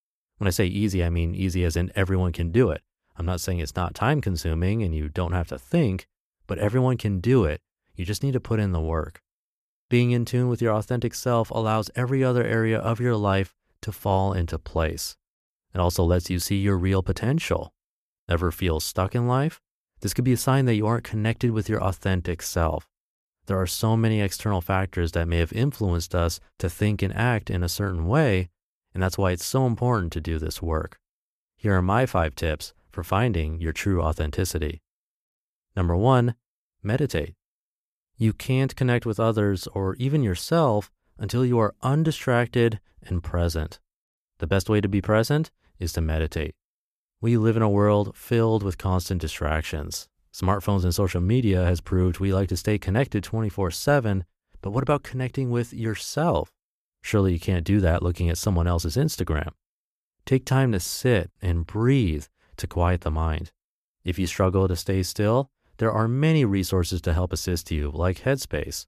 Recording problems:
none

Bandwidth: 14.5 kHz